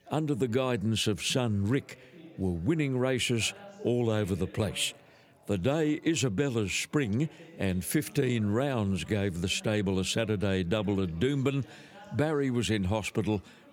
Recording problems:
background chatter; faint; throughout; 4 voices, 25 dB below the speech

